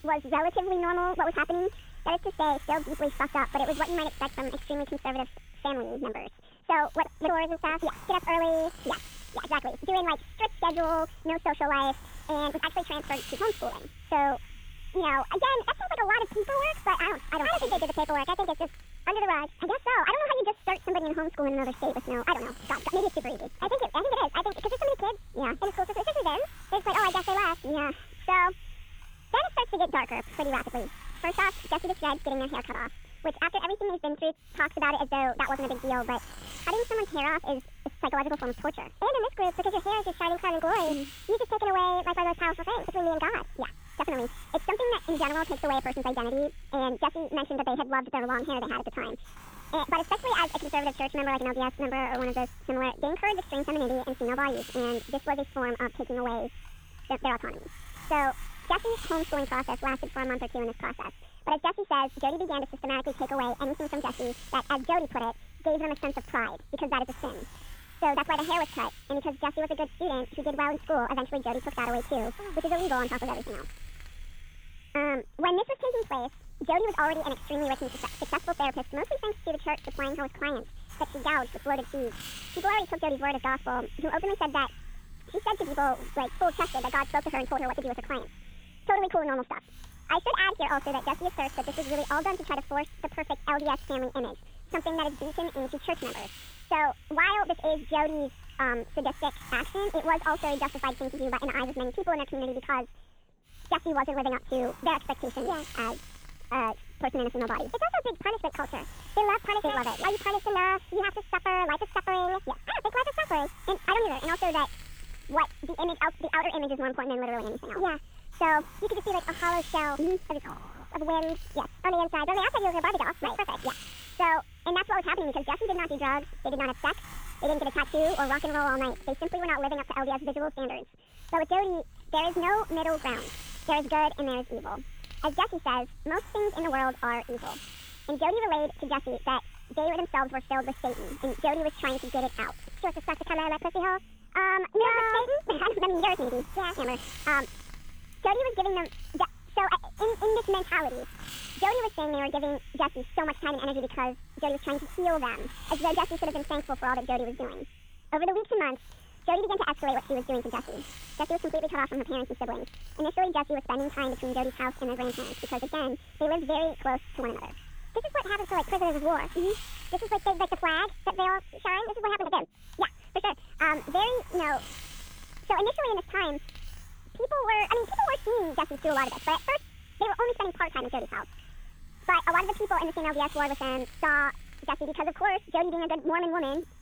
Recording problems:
high frequencies cut off; severe; nothing above 4 kHz
wrong speed and pitch; too fast and too high; 1.6 times normal speed
garbled, watery; slightly
hiss; noticeable; throughout; 20 dB below the speech

